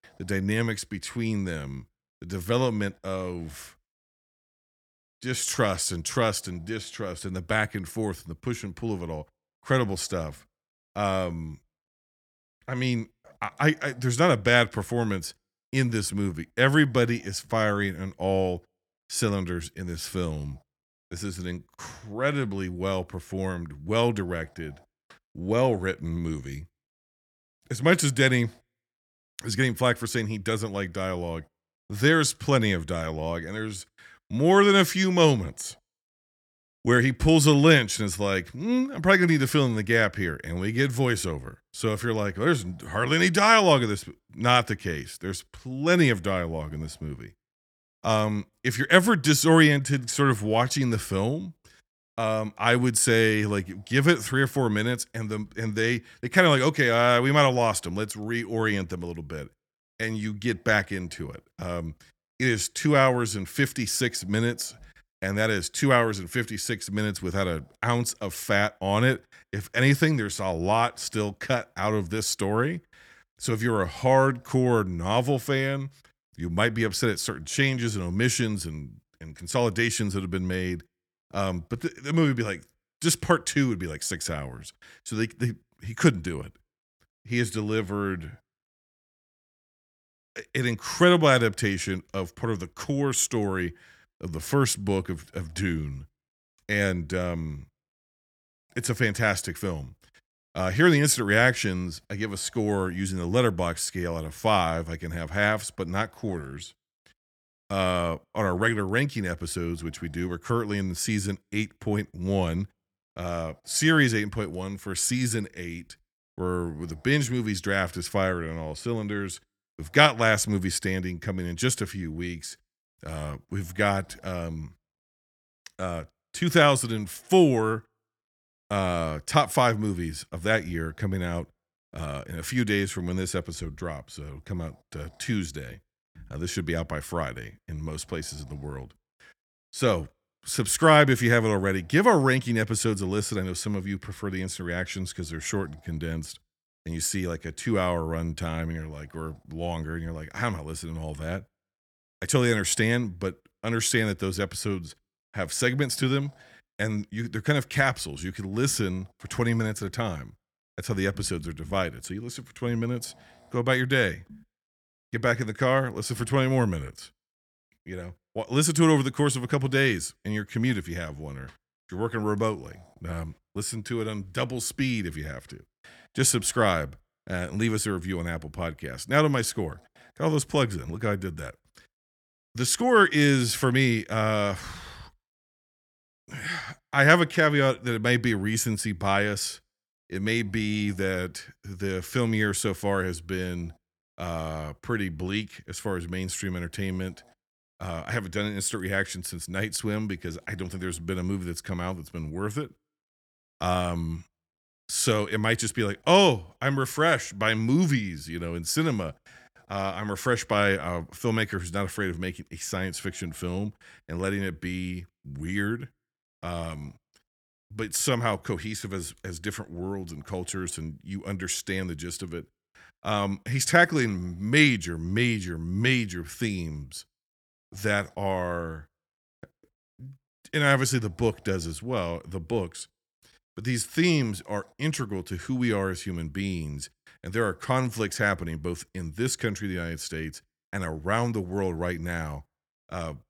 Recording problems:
none

